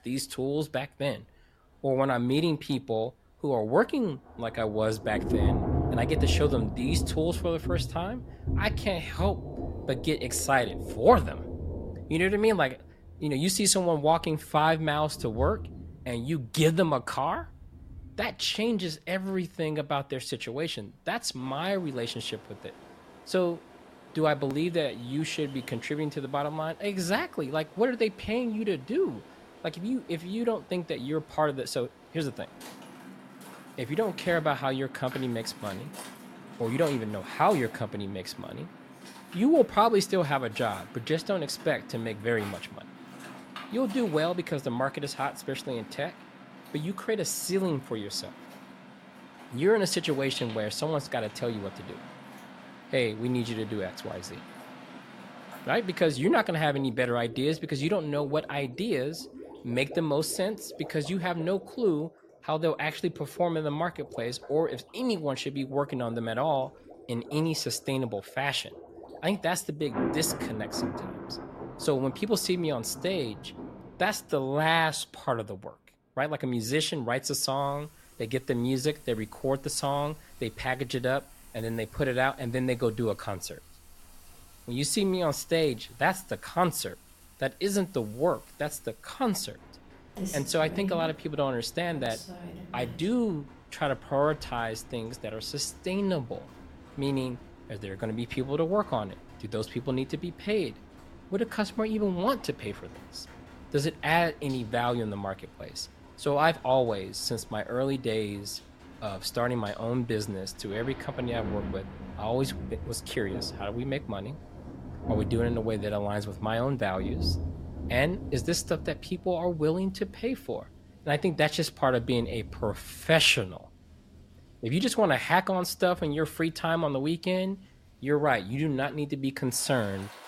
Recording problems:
rain or running water; noticeable; throughout; 10 dB below the speech

